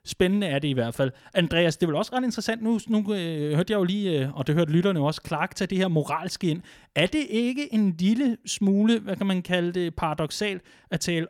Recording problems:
none

